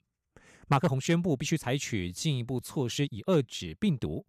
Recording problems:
uneven, jittery; strongly; from 0.5 s on

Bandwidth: 14.5 kHz